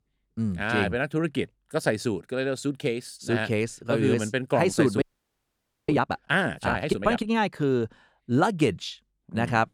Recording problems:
audio freezing; at 5 s for 1 s

